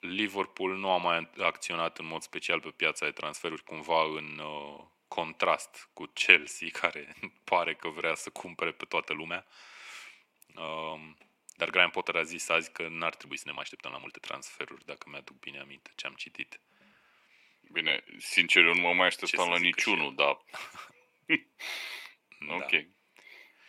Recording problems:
thin; very; fading below 450 Hz
uneven, jittery; strongly; from 3.5 to 23 s

